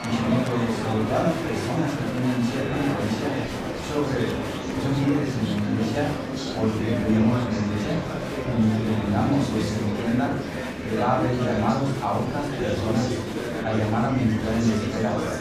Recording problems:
off-mic speech; far
room echo; noticeable; dies away in 0.5 s
murmuring crowd; loud; throughout; 4 dB below the speech

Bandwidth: 14.5 kHz